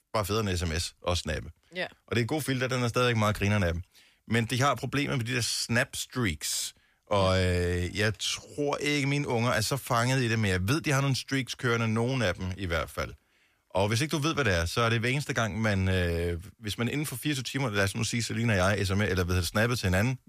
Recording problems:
none

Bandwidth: 14.5 kHz